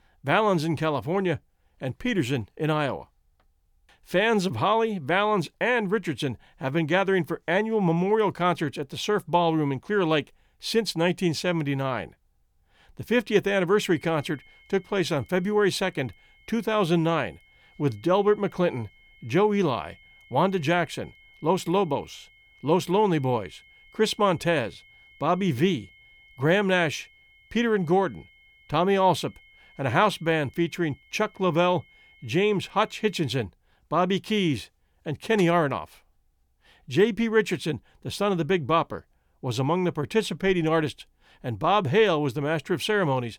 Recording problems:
high-pitched whine; faint; from 14 to 33 s; 2 kHz, 30 dB below the speech

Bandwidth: 18.5 kHz